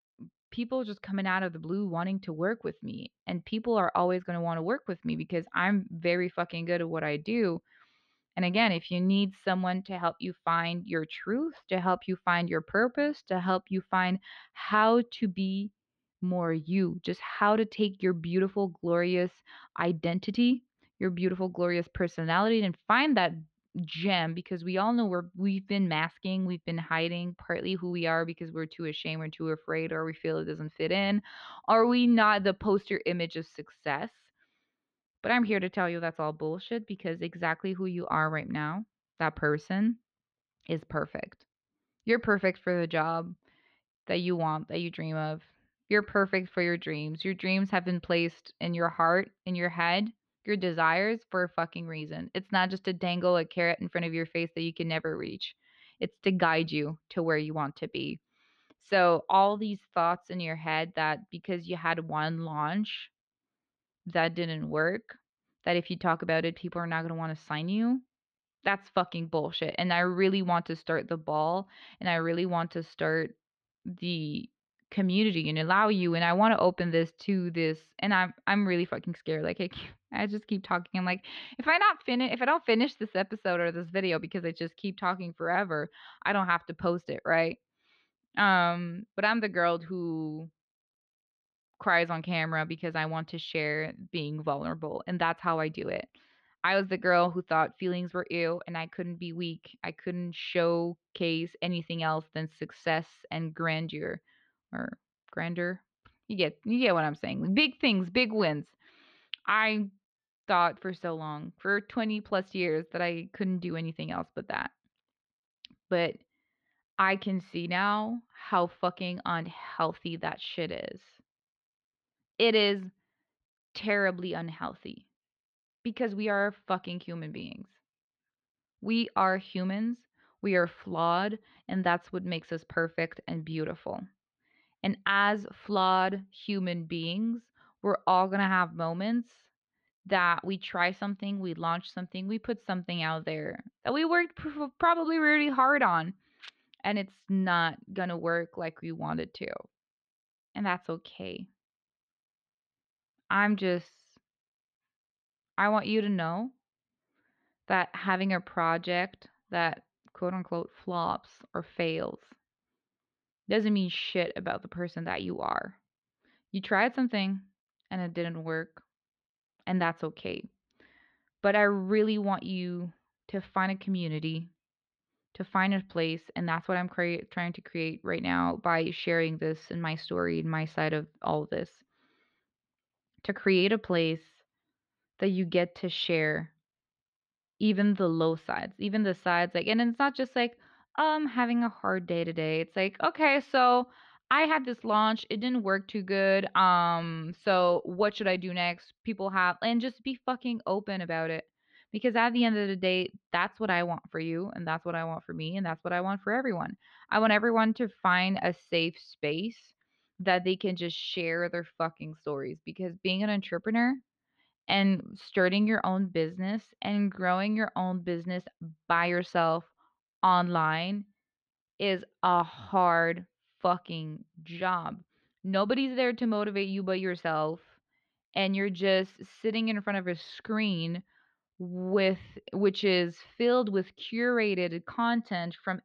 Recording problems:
muffled; very slightly; fading above 4 kHz

